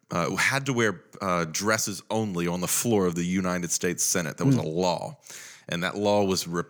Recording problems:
none

